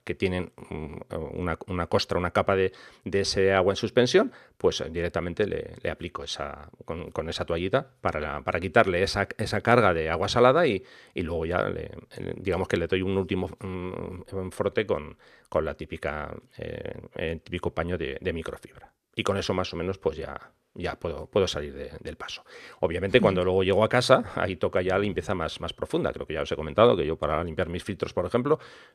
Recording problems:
none

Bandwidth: 14.5 kHz